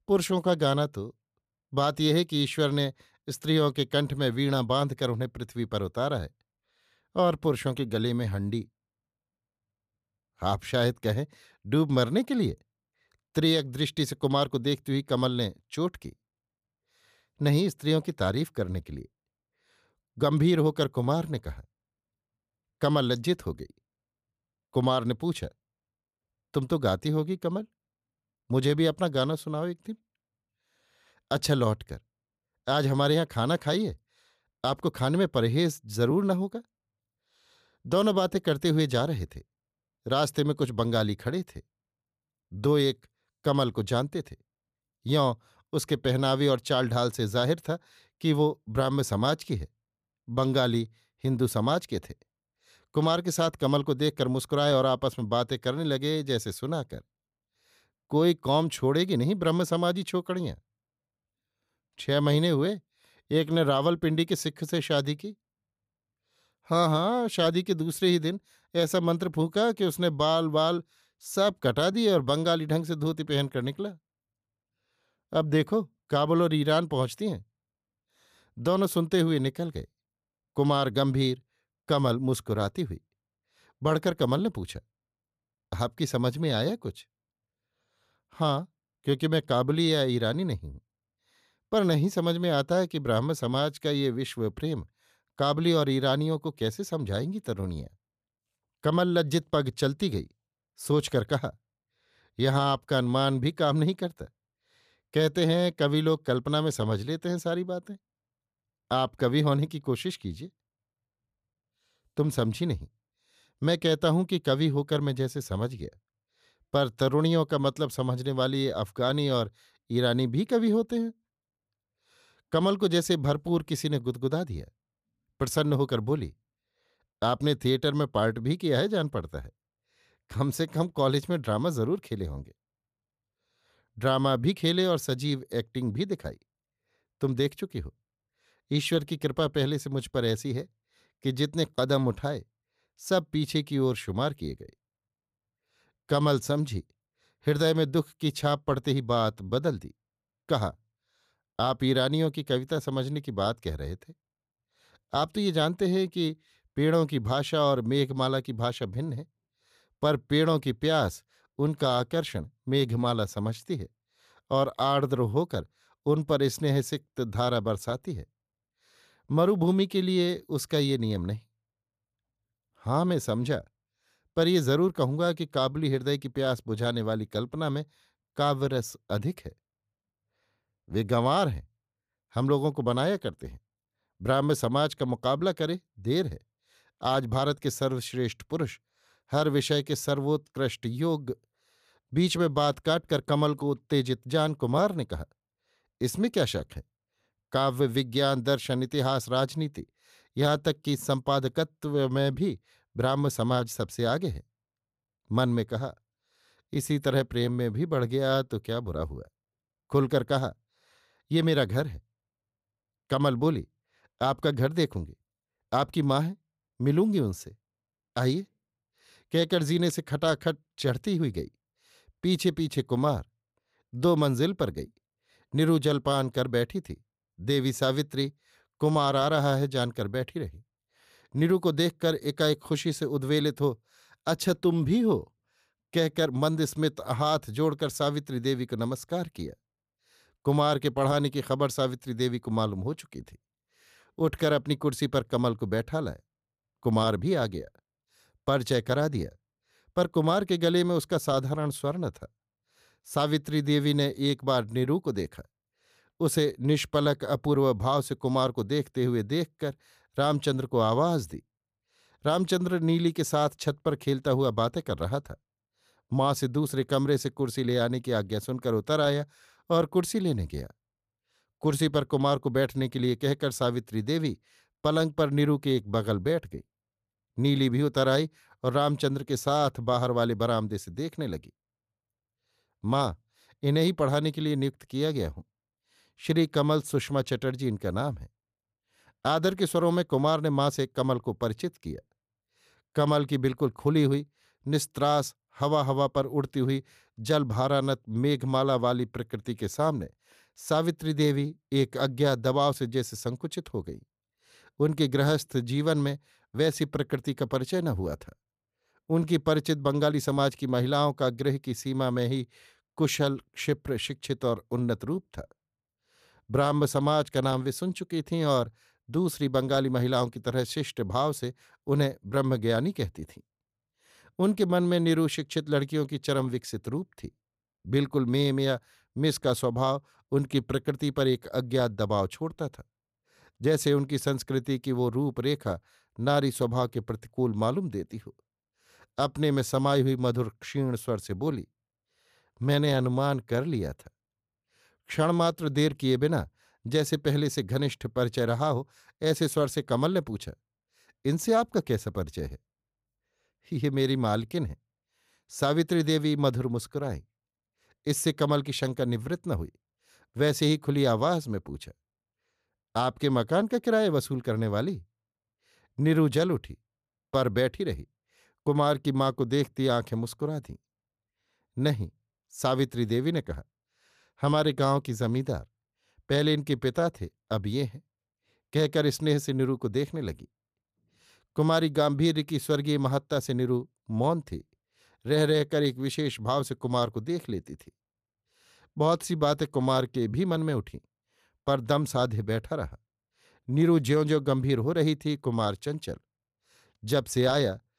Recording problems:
none

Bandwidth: 14.5 kHz